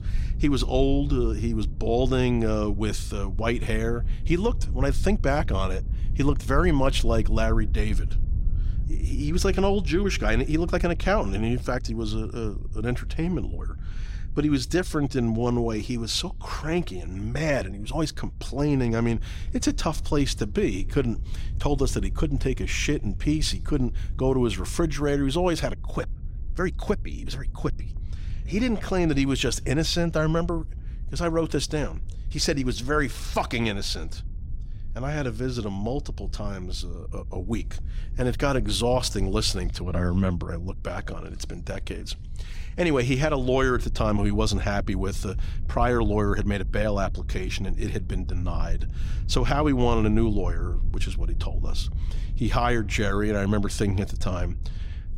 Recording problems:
low rumble; faint; throughout; 20 dB below the speech

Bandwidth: 16 kHz